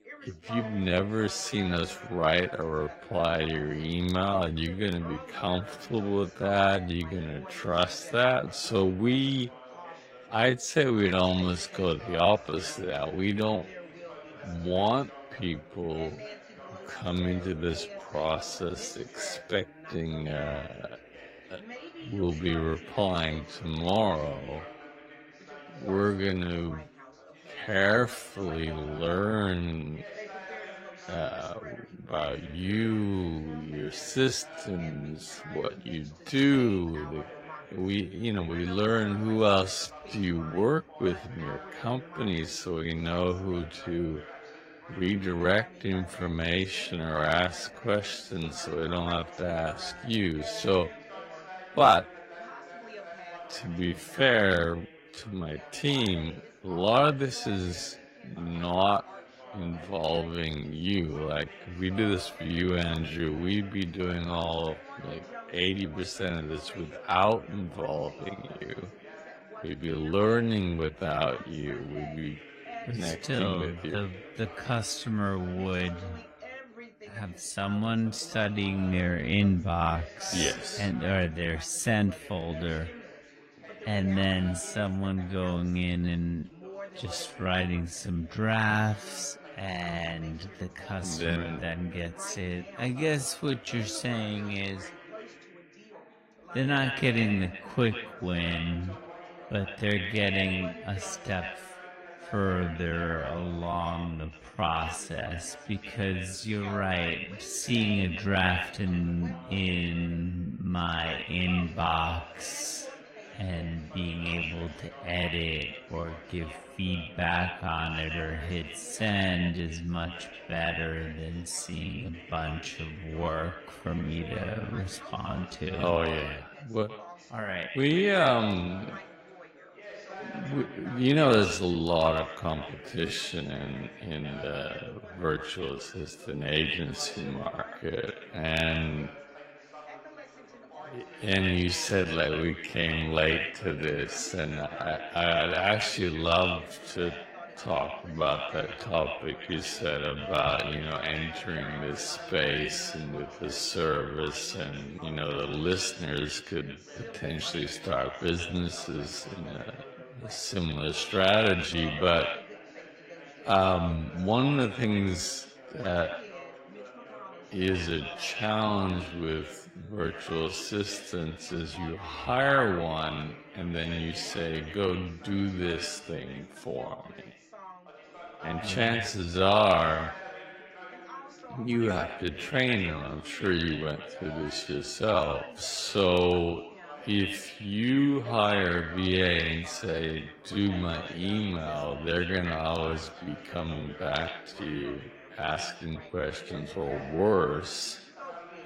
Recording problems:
echo of what is said; strong; from 1:36 on; 130 ms later, 9 dB below the speech
wrong speed, natural pitch; too slow; 0.5 times normal speed
garbled, watery; slightly; nothing above 16 kHz
background chatter; noticeable; throughout; 3 voices, 15 dB below the speech

